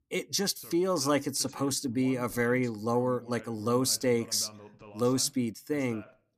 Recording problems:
voice in the background; faint; throughout; 20 dB below the speech

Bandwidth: 14.5 kHz